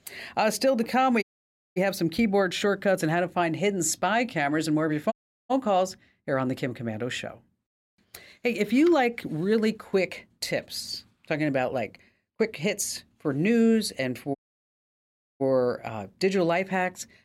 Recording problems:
audio cutting out; at 1 s for 0.5 s, at 5 s and at 14 s for 1 s

